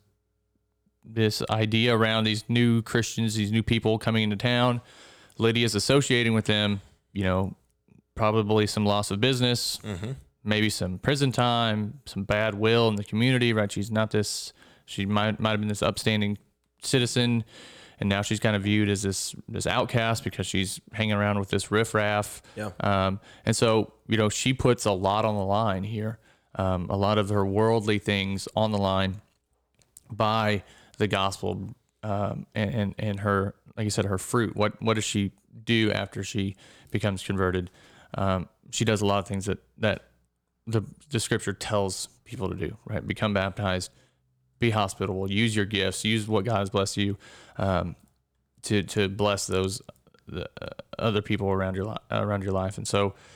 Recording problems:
none

